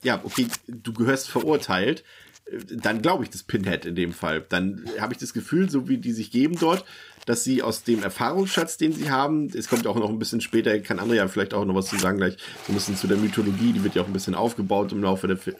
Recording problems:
household noises; noticeable; throughout; 15 dB below the speech

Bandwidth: 15.5 kHz